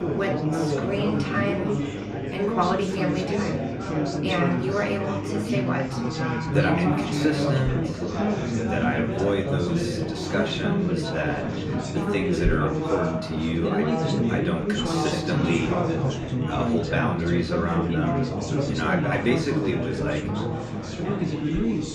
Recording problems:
off-mic speech; far
room echo; slight; dies away in 0.4 s
chatter from many people; very loud; throughout; 2 dB above the speech
electrical hum; faint; throughout; 50 Hz, 20 dB below the speech

